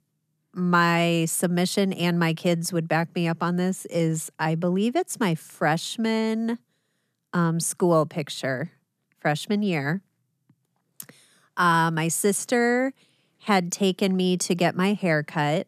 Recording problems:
none

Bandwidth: 14 kHz